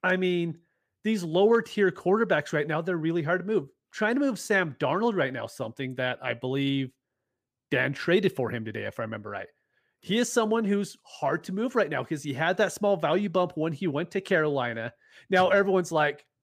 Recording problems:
none

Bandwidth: 15 kHz